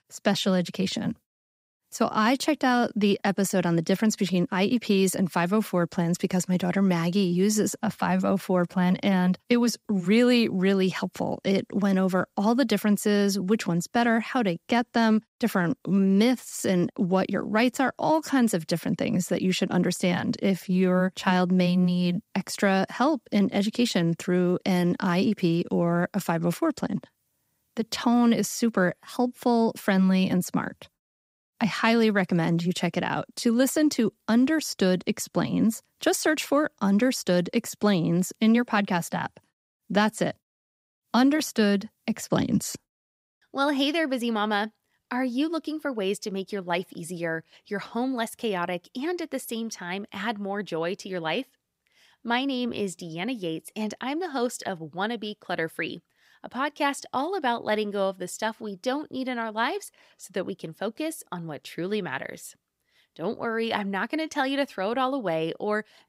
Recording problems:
none

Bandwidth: 15.5 kHz